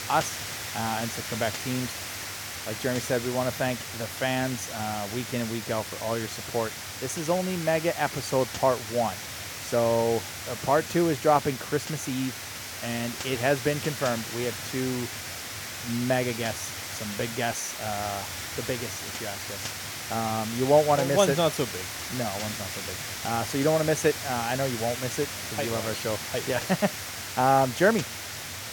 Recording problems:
hiss; loud; throughout; 6 dB below the speech

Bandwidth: 17.5 kHz